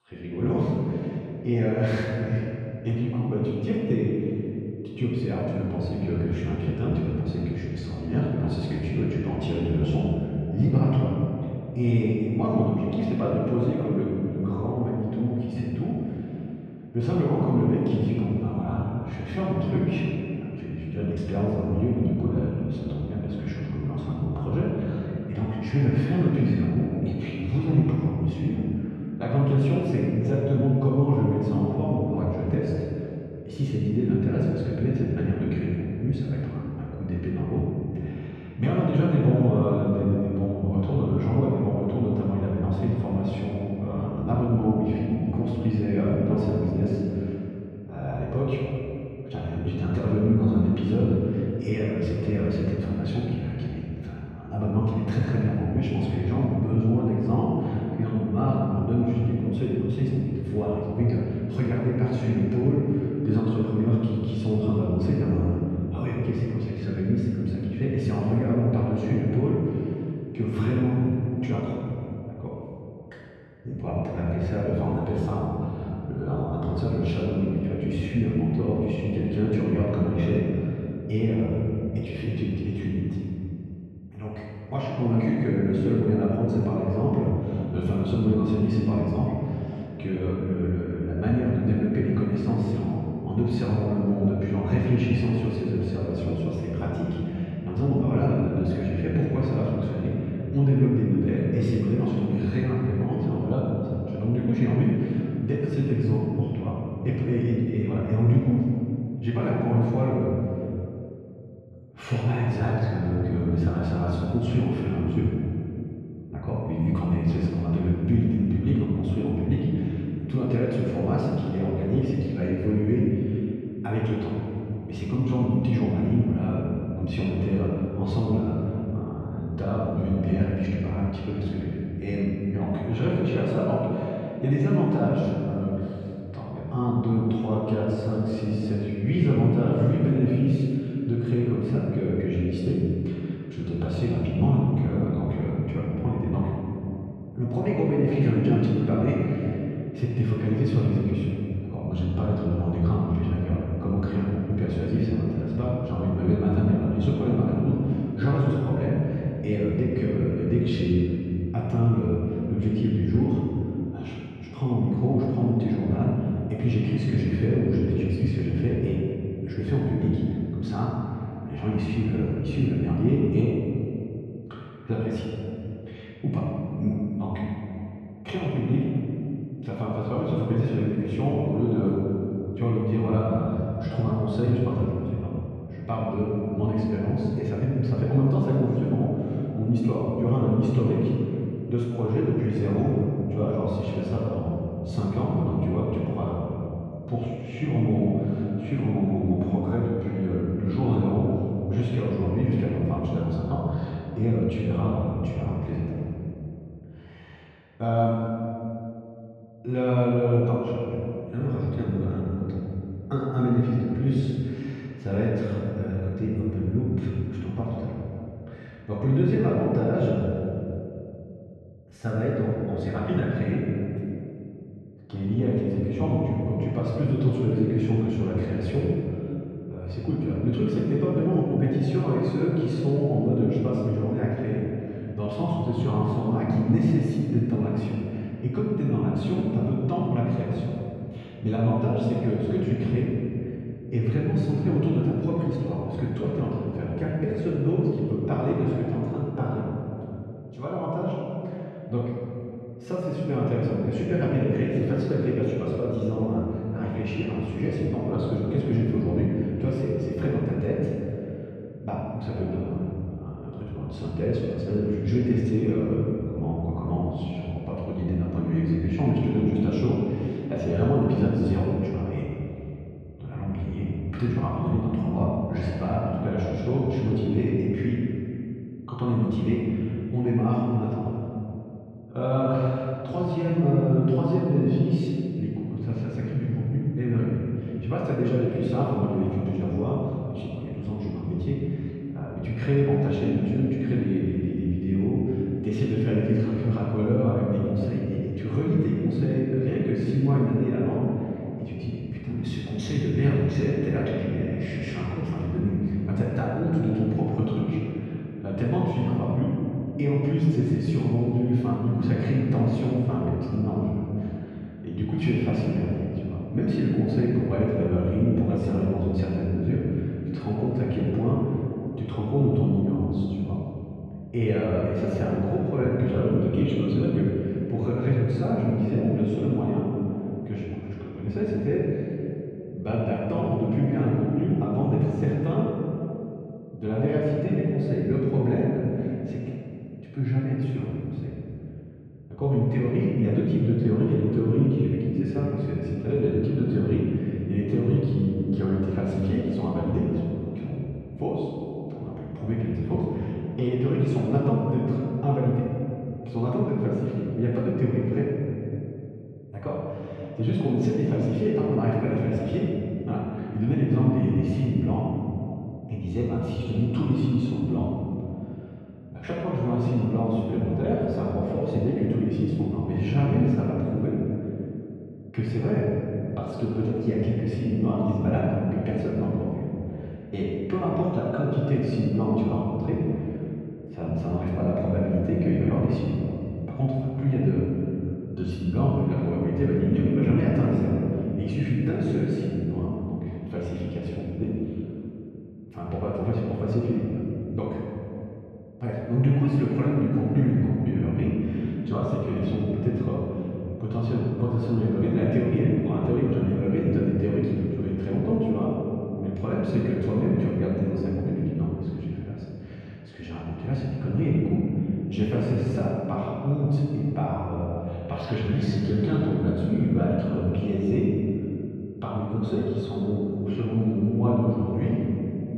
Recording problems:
room echo; strong; dies away in 2.7 s
off-mic speech; far
muffled; slightly; fading above 3 kHz

